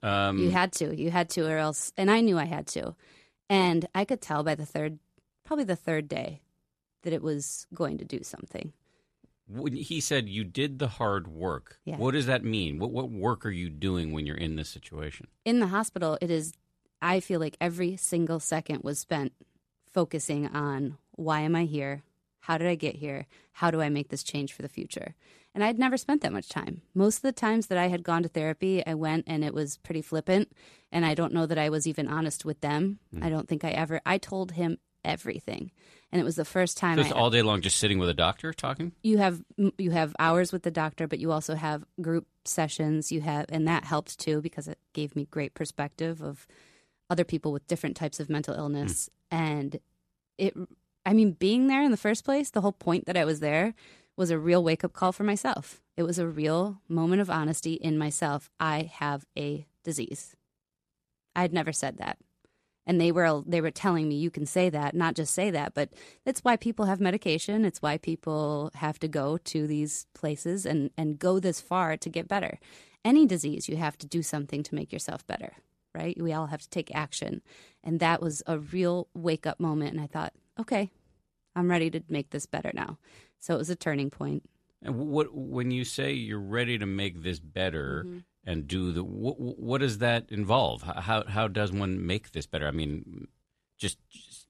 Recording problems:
none

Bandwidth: 13.5 kHz